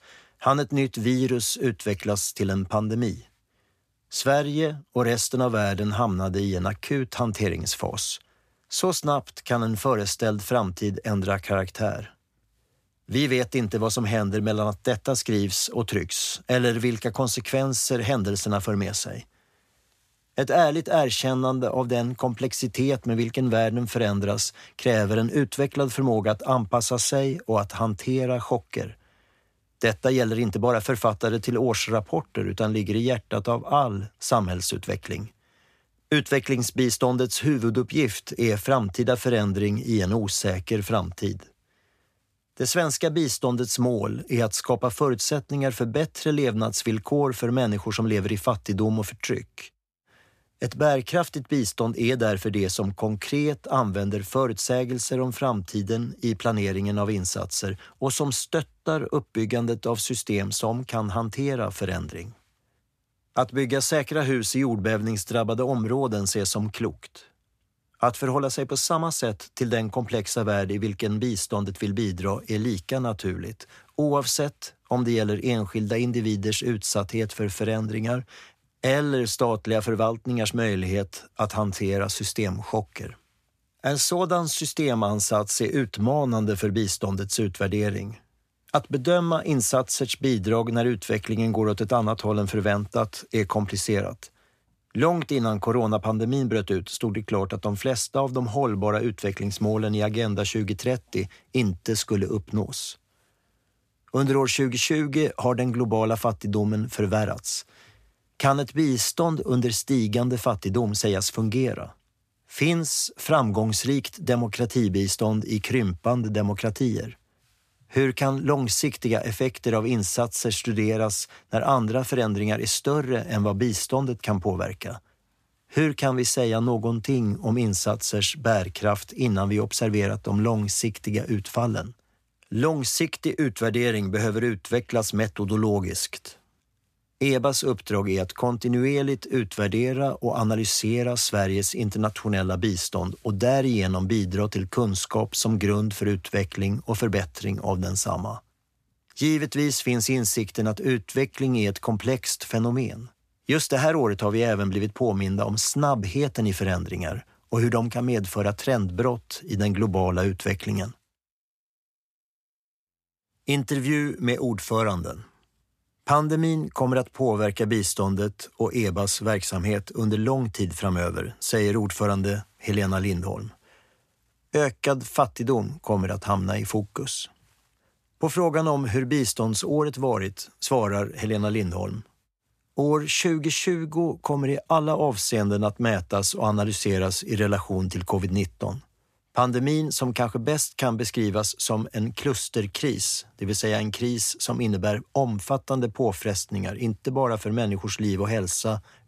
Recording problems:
none

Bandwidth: 14.5 kHz